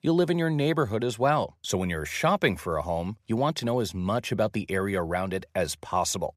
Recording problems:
none

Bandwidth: 15 kHz